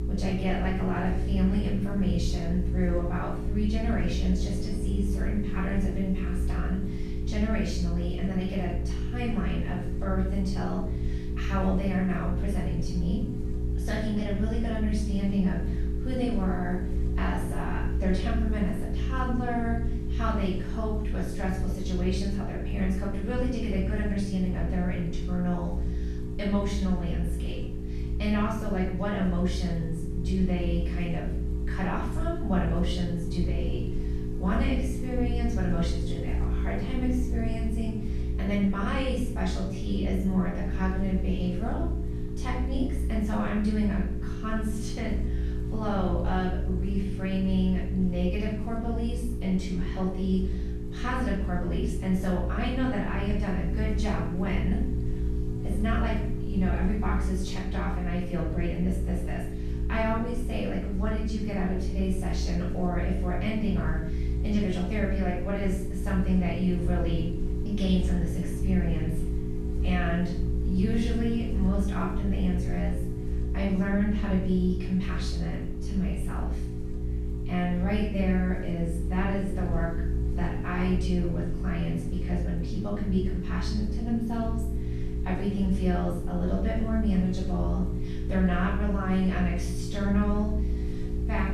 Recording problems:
off-mic speech; far
room echo; noticeable; dies away in 0.6 s
electrical hum; loud; throughout; 60 Hz, 7 dB below the speech

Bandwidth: 13.5 kHz